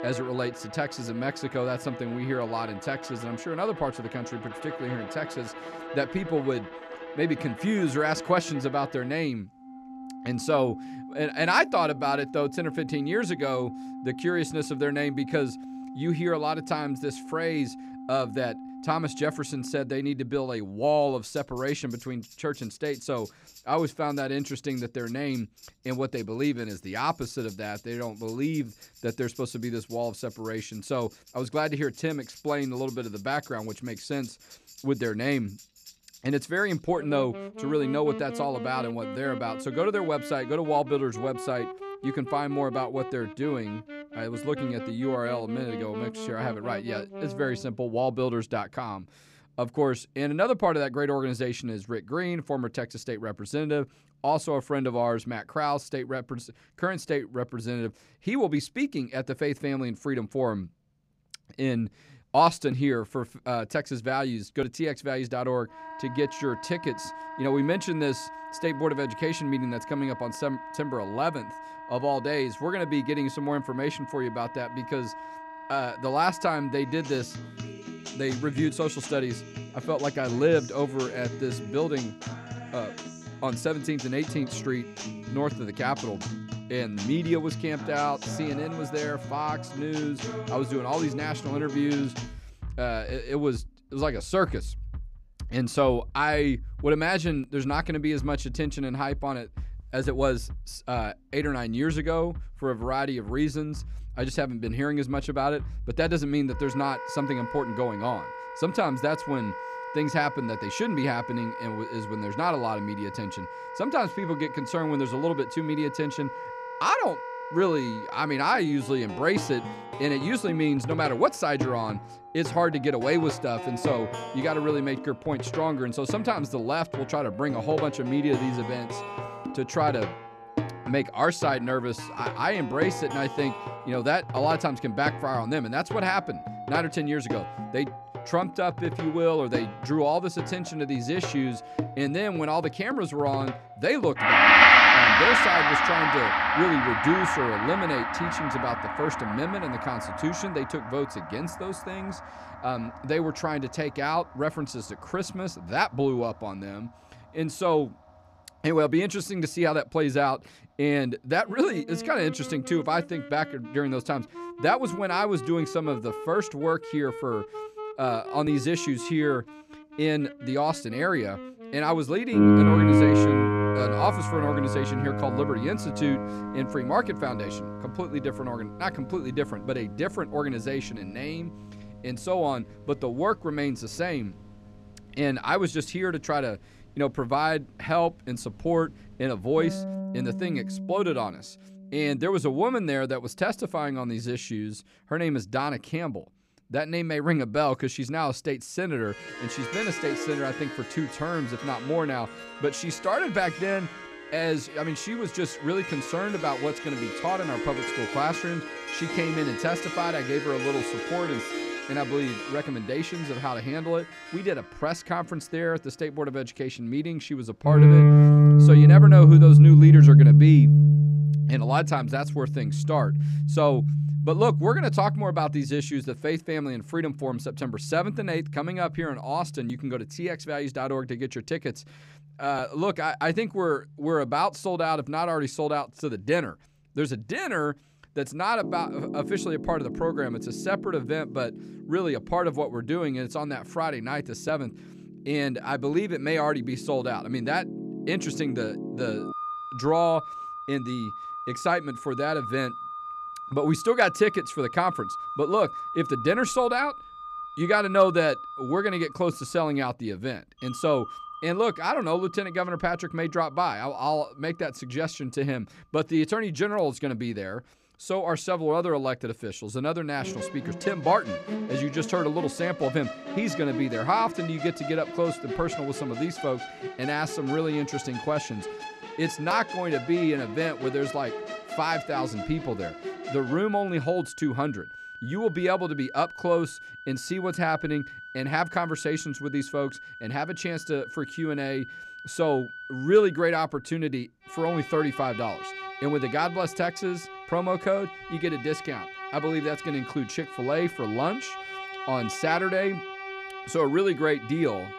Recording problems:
background music; very loud; throughout; 3 dB above the speech

